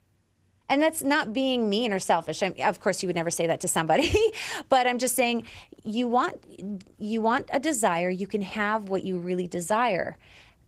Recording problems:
garbled, watery; slightly; nothing above 15.5 kHz

